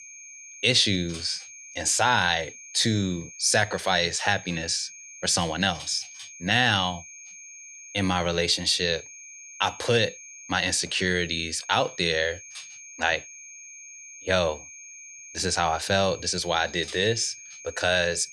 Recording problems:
high-pitched whine; noticeable; throughout; 6.5 kHz, 15 dB below the speech

